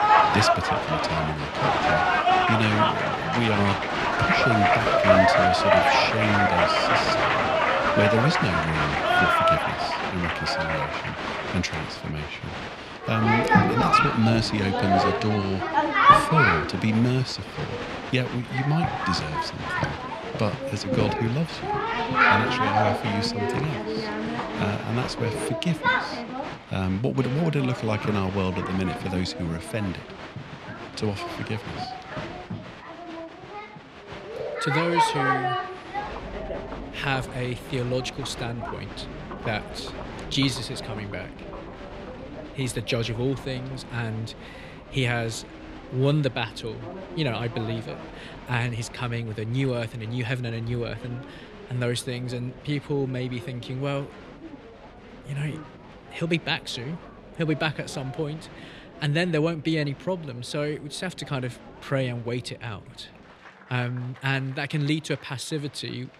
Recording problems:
crowd noise; very loud; throughout; 4 dB above the speech

